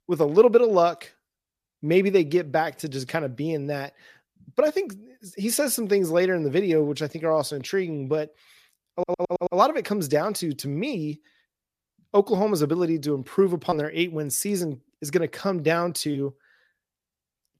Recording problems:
audio stuttering; at 9 s

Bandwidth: 14.5 kHz